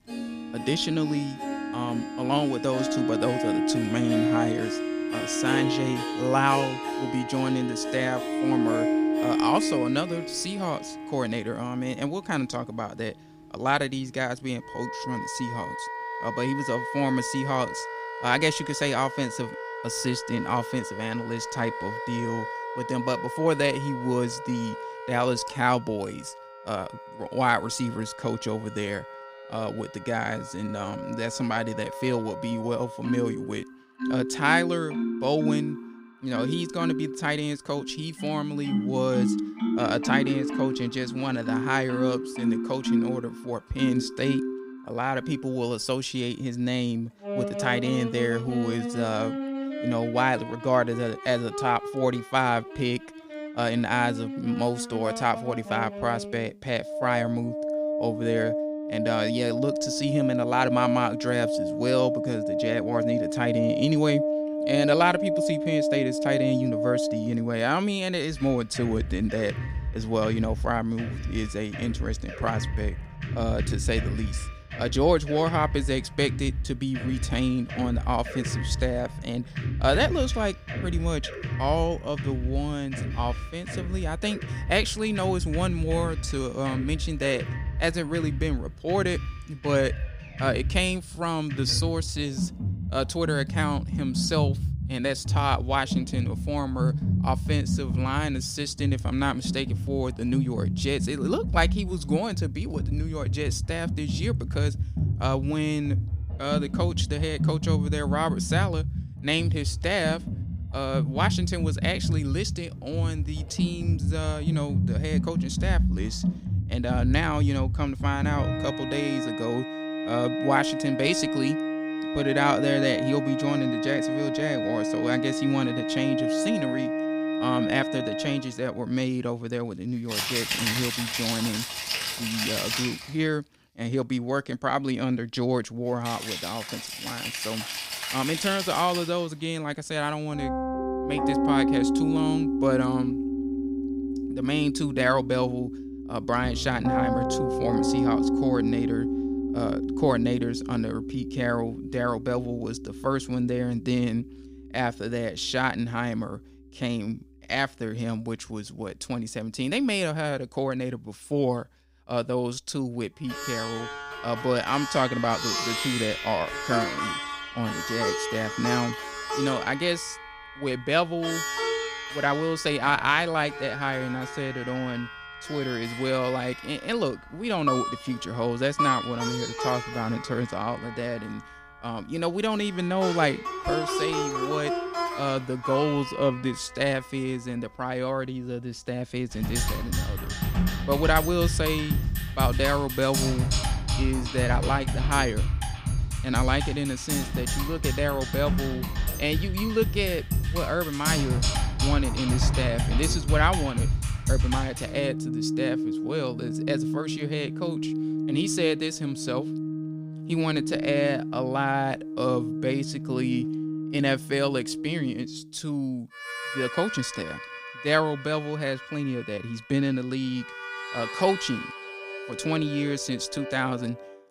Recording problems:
background music; loud; throughout; 2 dB below the speech

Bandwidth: 15.5 kHz